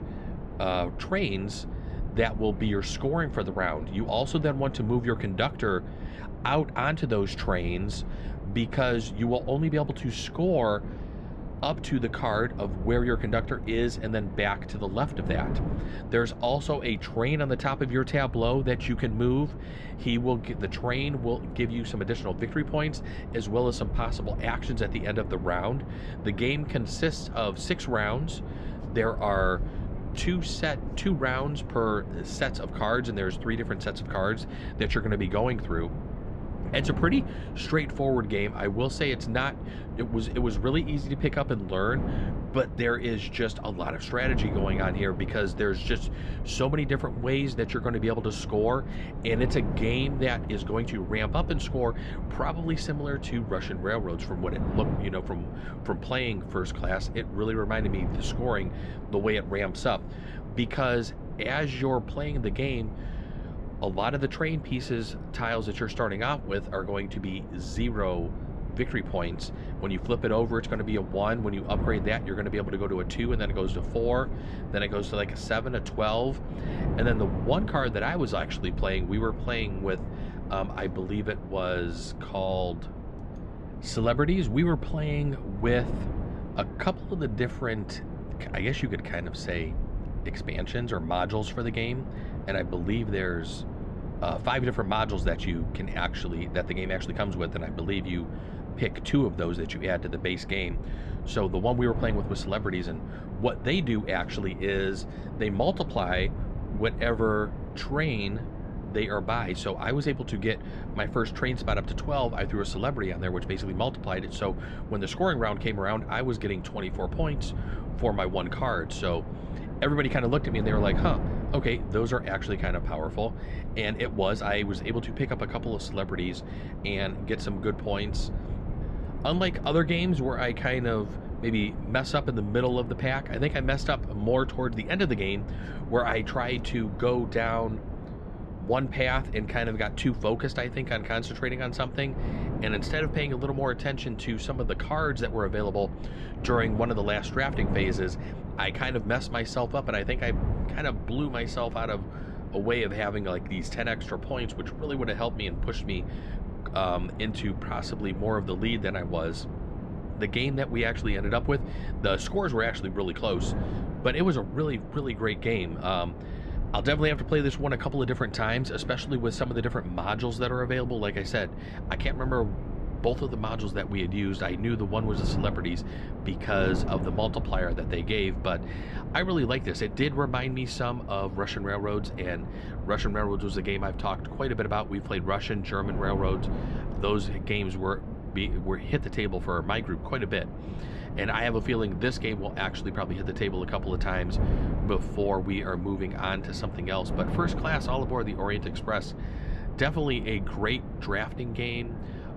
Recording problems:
muffled; slightly; fading above 3.5 kHz
wind noise on the microphone; occasional gusts; 15 dB below the speech

